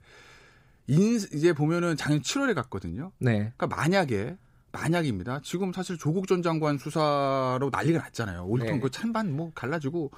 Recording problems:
none

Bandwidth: 15.5 kHz